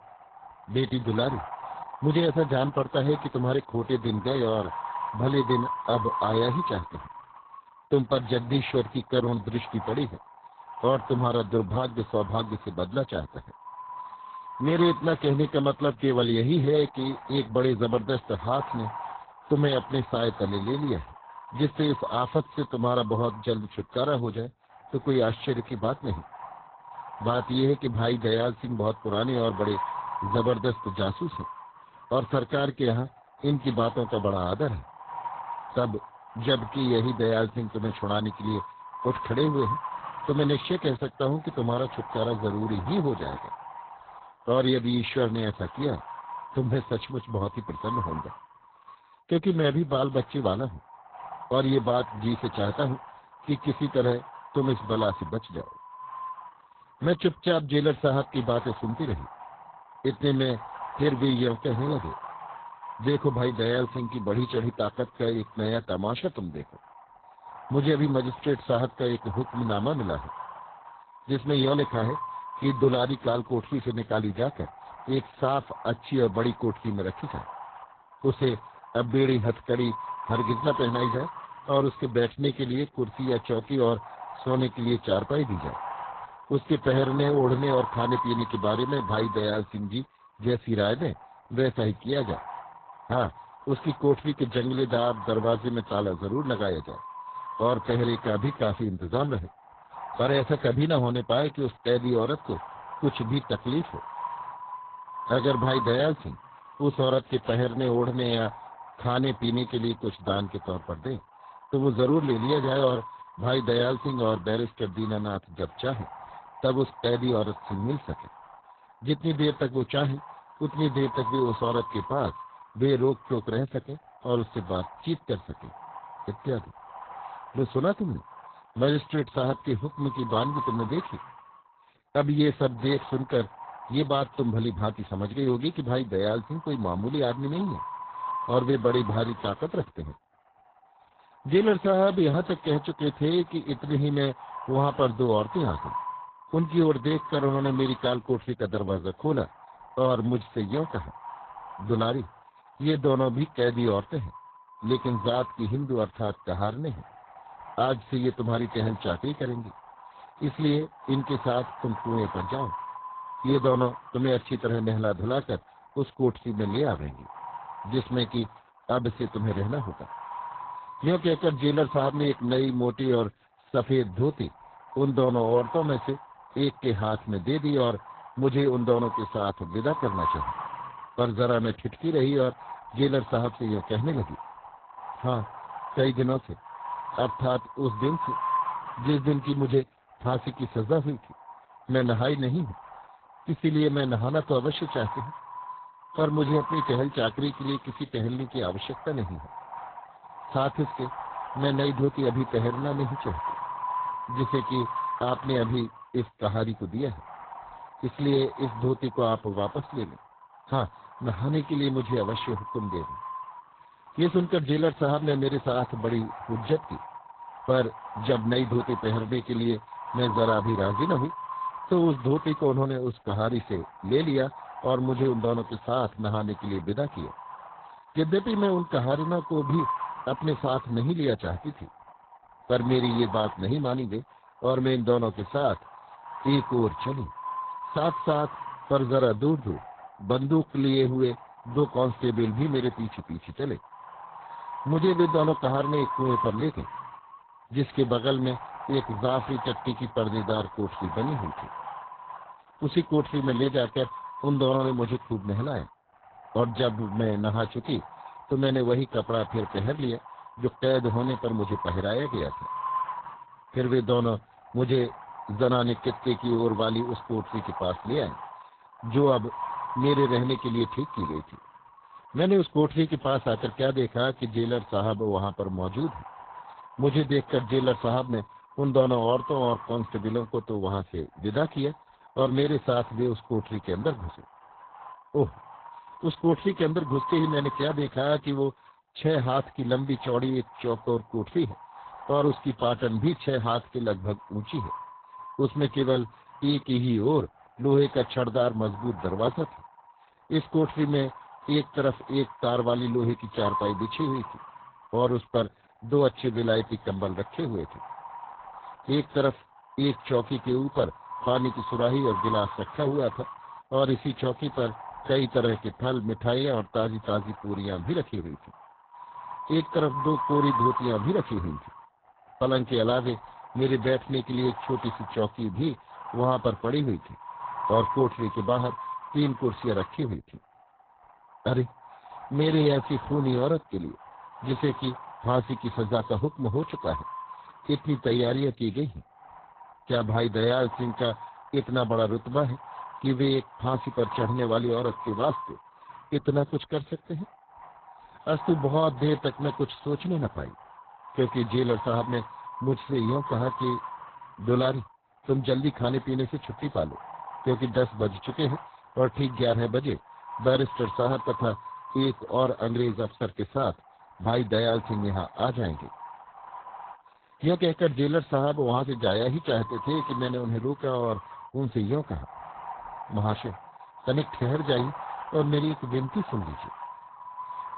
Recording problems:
garbled, watery; badly; nothing above 4 kHz
wind noise on the microphone; heavy; 8 dB below the speech

